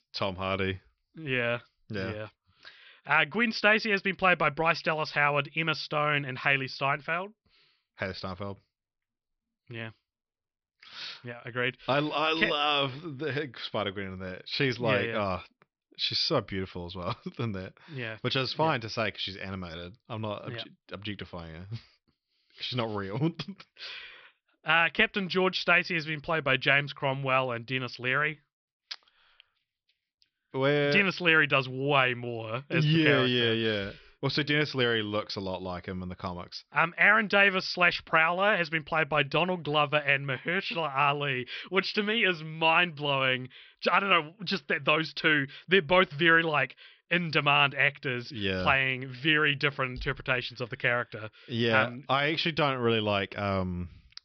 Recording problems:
high frequencies cut off; noticeable; nothing above 5.5 kHz

